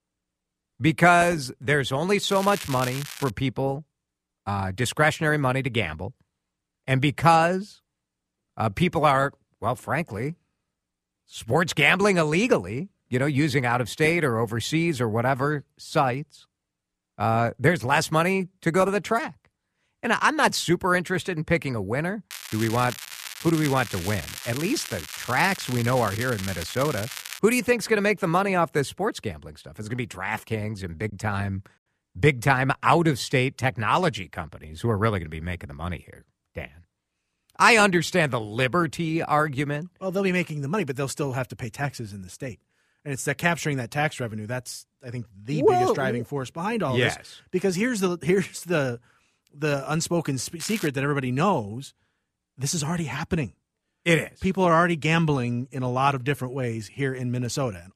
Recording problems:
crackling; noticeable; at 2.5 s, from 22 to 27 s and at 51 s; 10 dB below the speech
choppy; occasionally; at 31 s; 2% of the speech affected

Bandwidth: 14.5 kHz